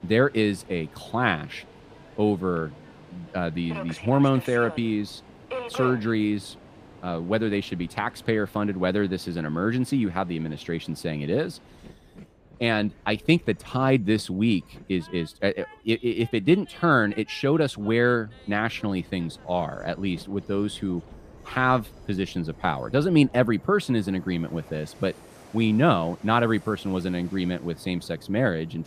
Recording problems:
train or aircraft noise; noticeable; throughout; 20 dB below the speech

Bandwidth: 15 kHz